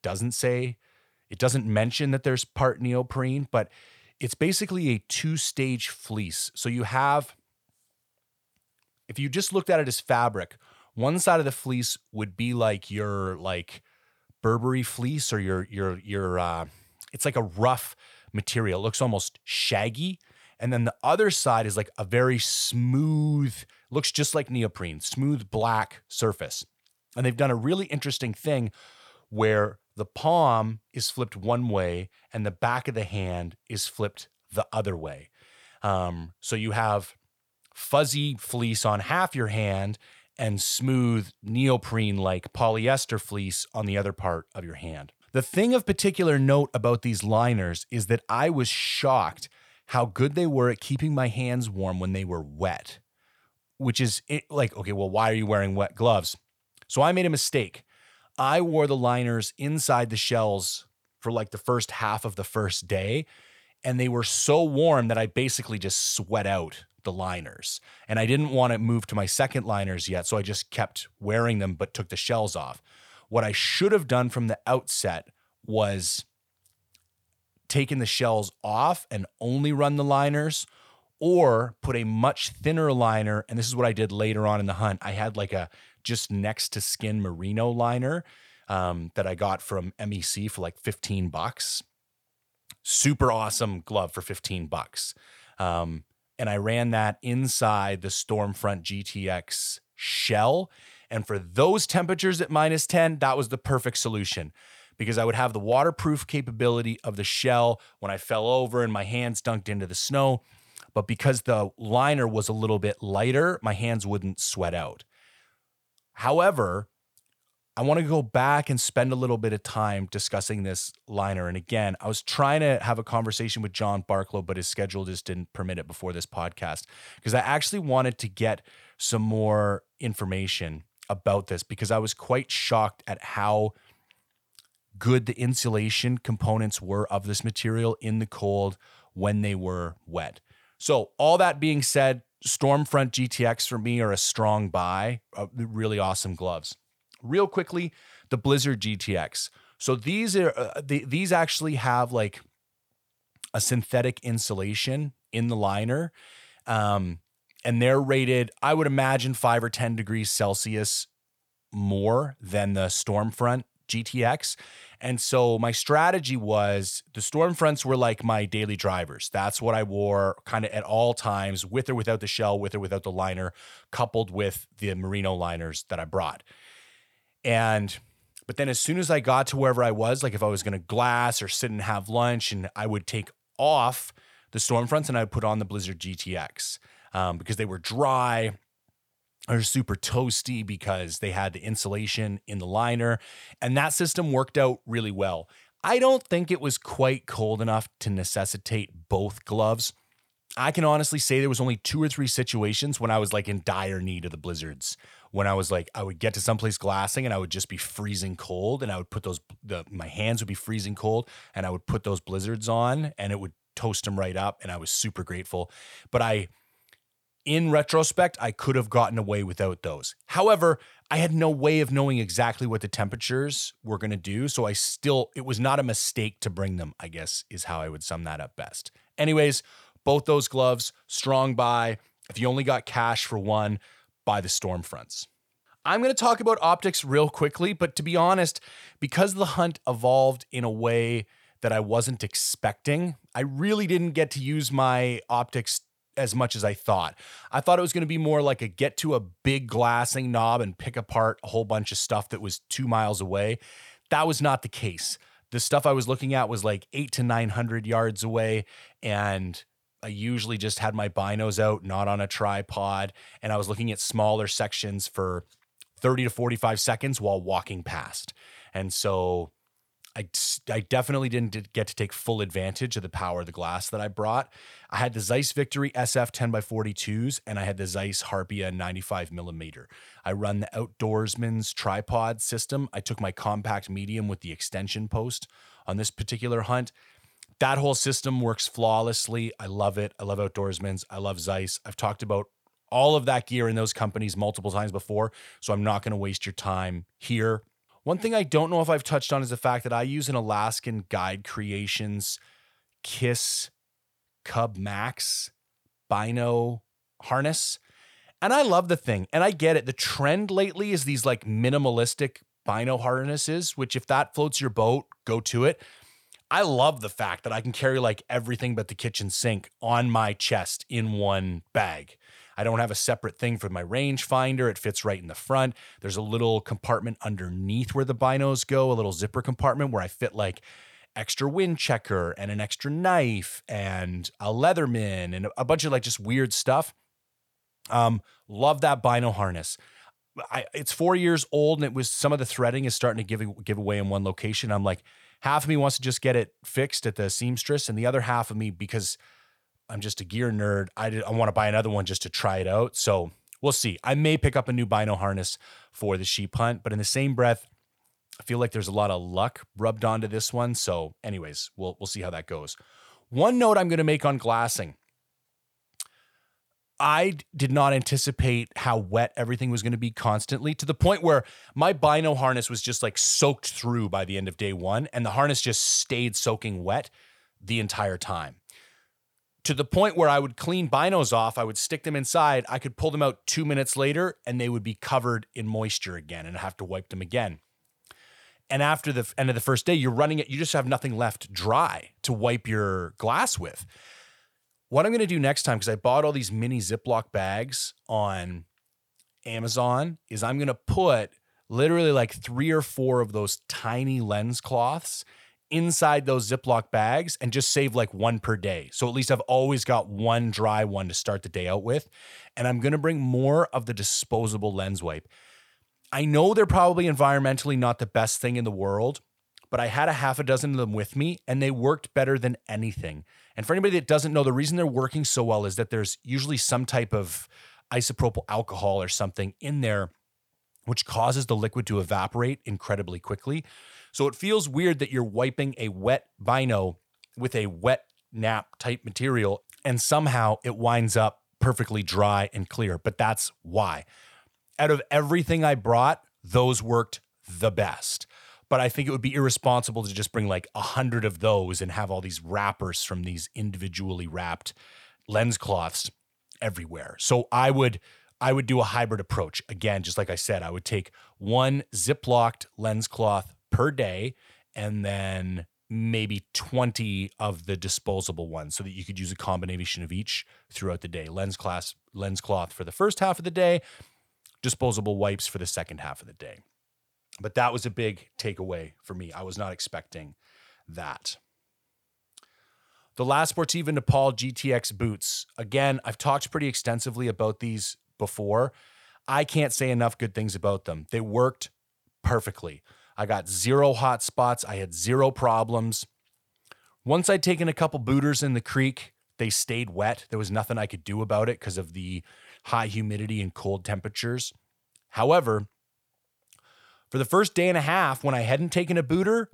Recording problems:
none

